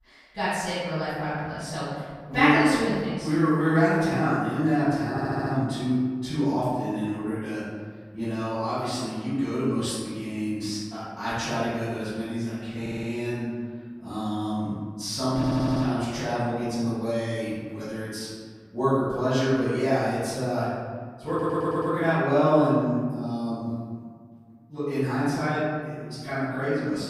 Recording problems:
room echo; strong; dies away in 1.7 s
off-mic speech; far
audio stuttering; 4 times, first at 5 s

